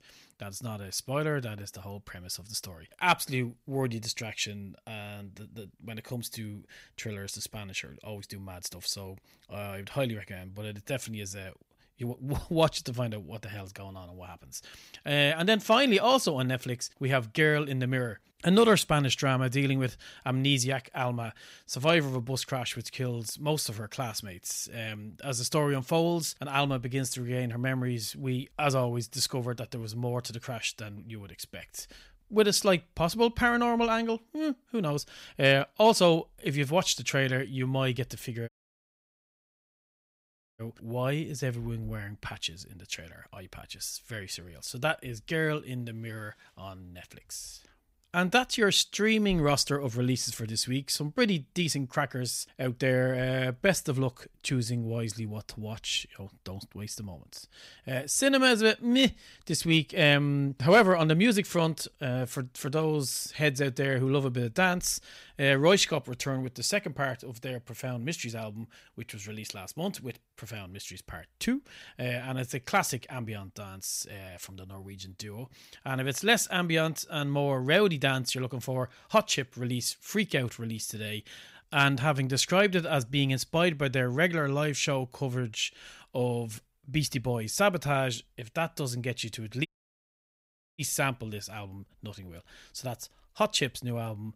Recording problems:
audio cutting out; at 38 s for 2 s and at 1:30 for 1 s

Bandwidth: 15.5 kHz